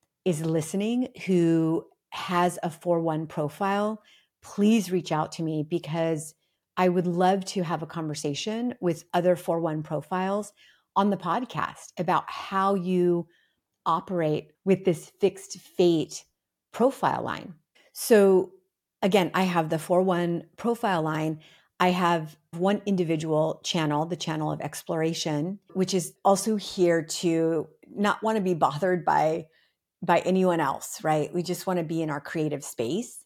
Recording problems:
none

